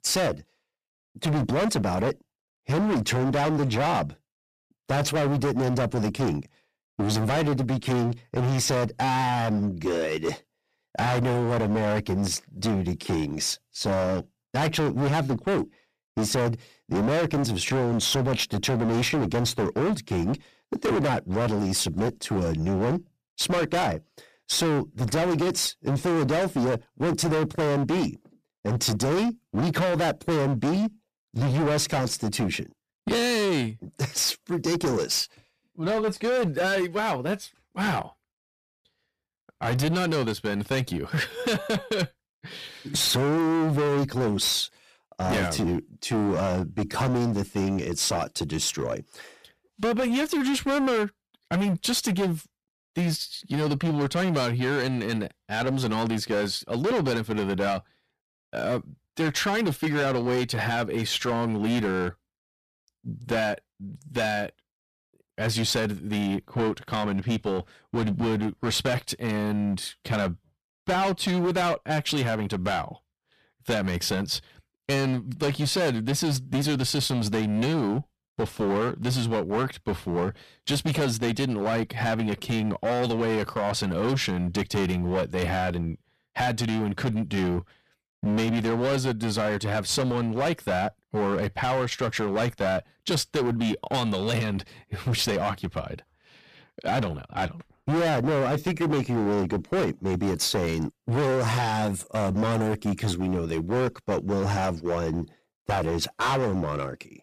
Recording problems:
distortion; heavy; 22% of the sound clipped

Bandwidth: 14.5 kHz